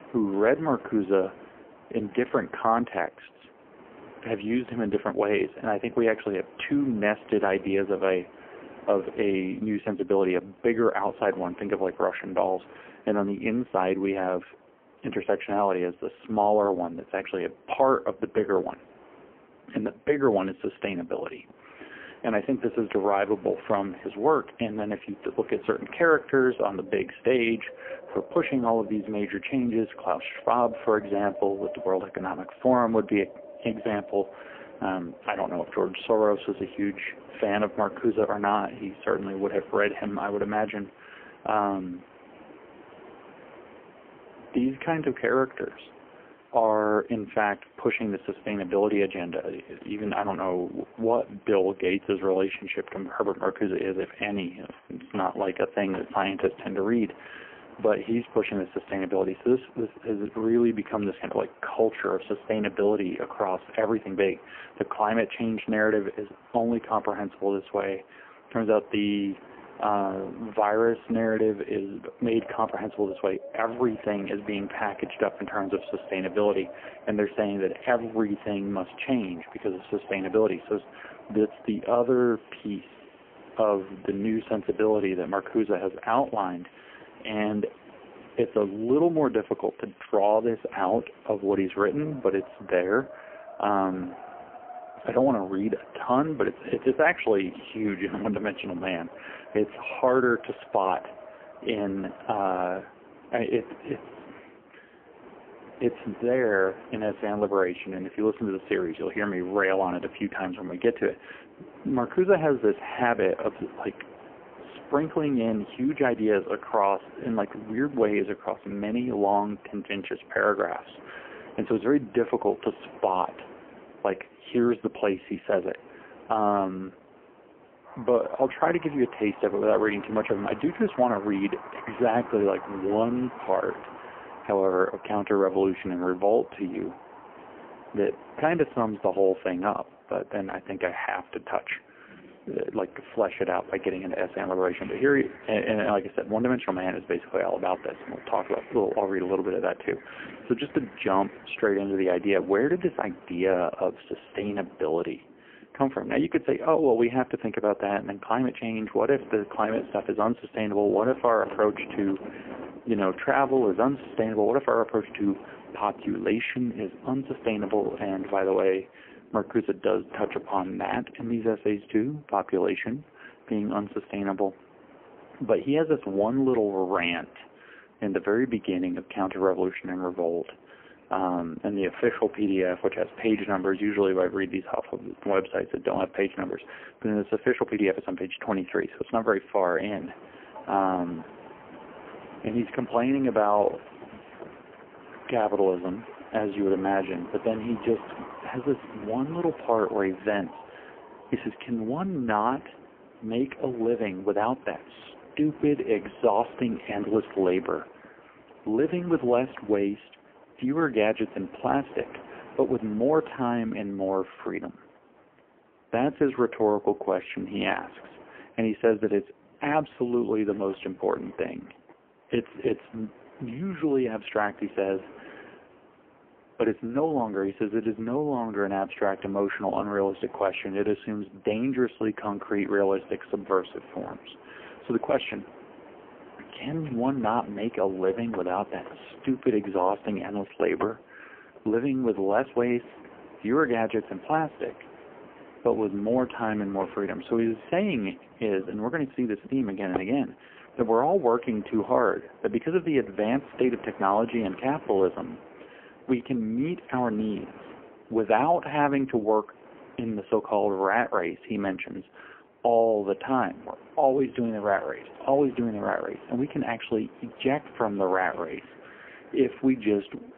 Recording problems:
phone-call audio; poor line; nothing above 3 kHz
wind in the background; noticeable; throughout; 20 dB below the speech

